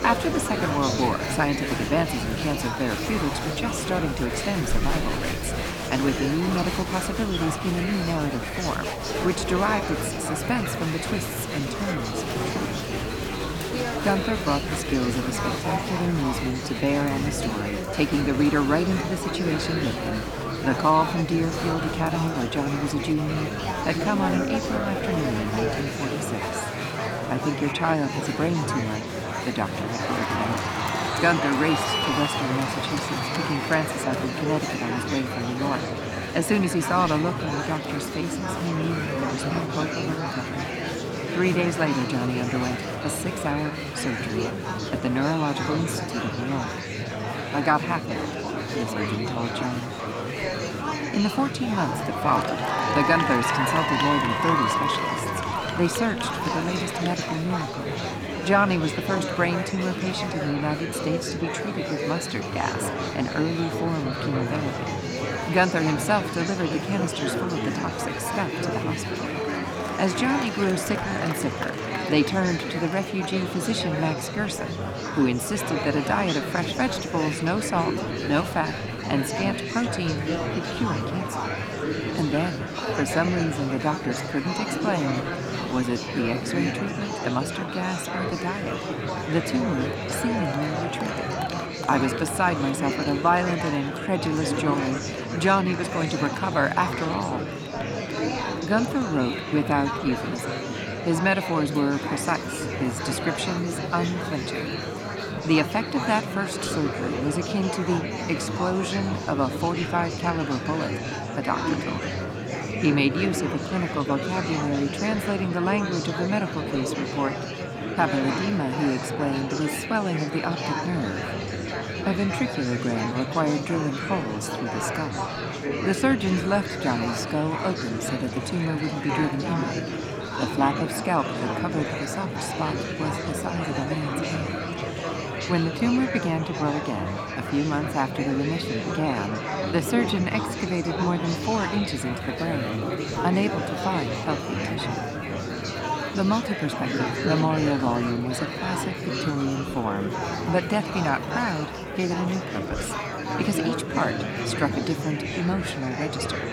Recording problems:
murmuring crowd; loud; throughout; 2 dB below the speech

